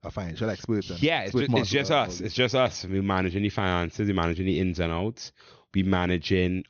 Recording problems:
high frequencies cut off; noticeable; nothing above 6.5 kHz

